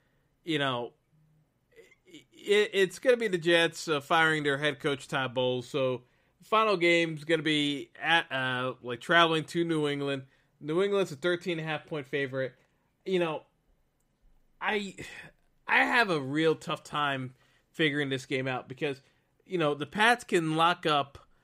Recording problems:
none

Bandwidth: 15.5 kHz